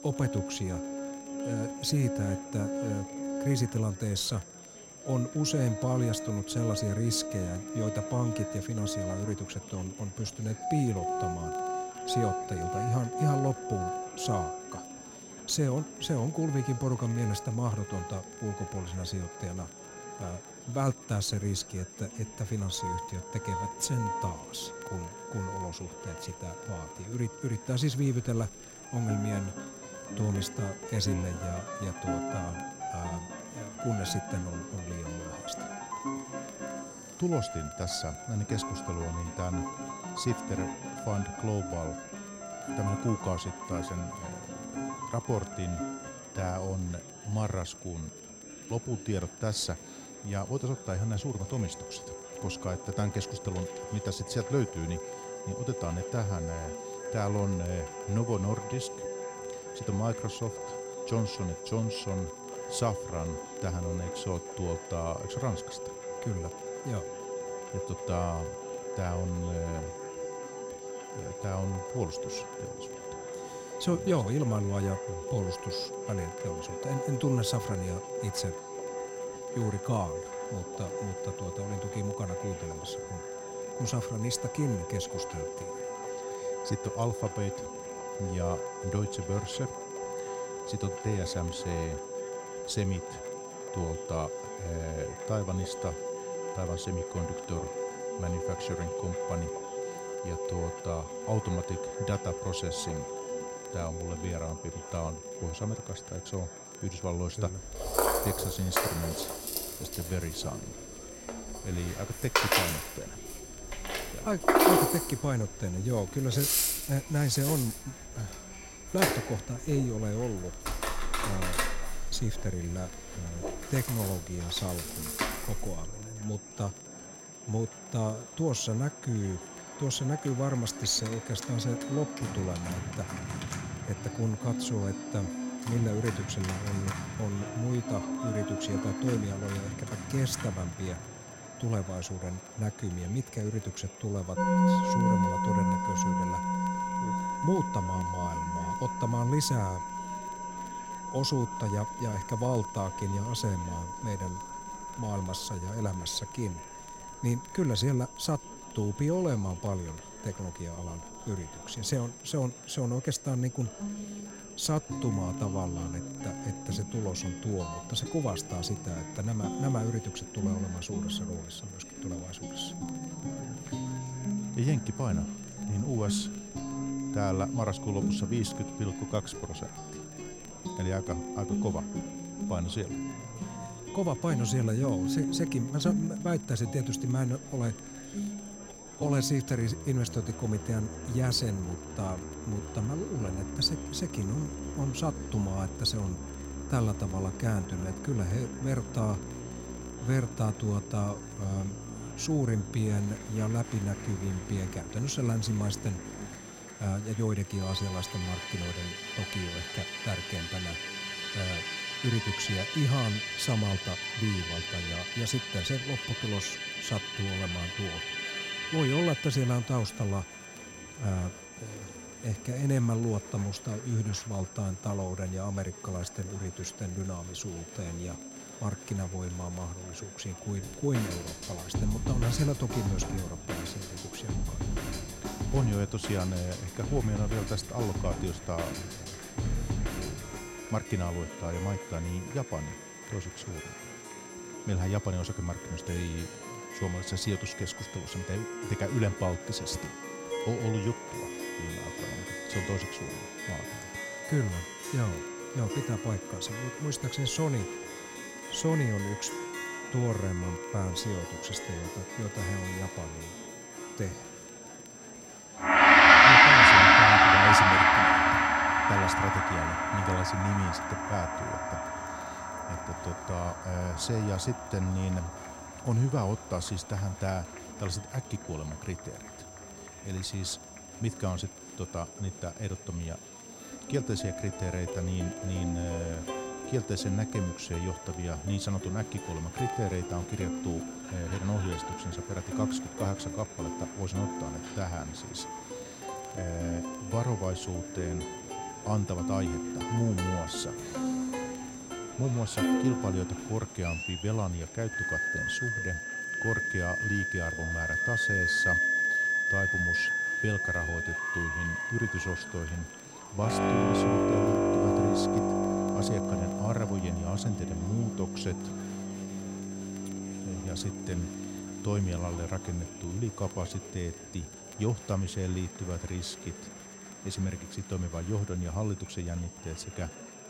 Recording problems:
background music; very loud; throughout; 2 dB above the speech
high-pitched whine; noticeable; throughout; 6 kHz, 15 dB below the speech
murmuring crowd; noticeable; throughout; 15 dB below the speech
crackle, like an old record; faint; 30 dB below the speech

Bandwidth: 16 kHz